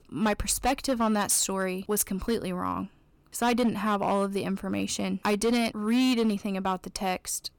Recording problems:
distortion; slight; 7% of the sound clipped

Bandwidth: 18 kHz